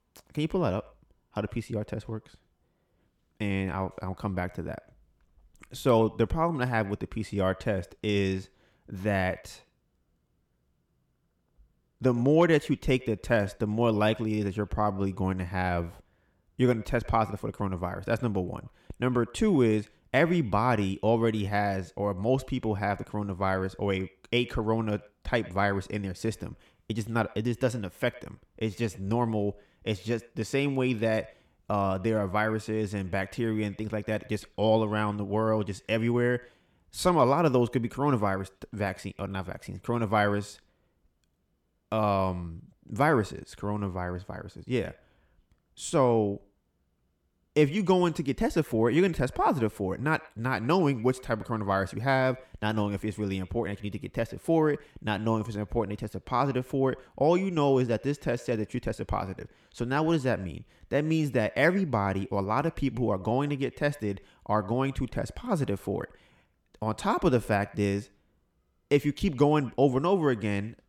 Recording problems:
echo of what is said; faint; throughout; 100 ms later, 25 dB below the speech

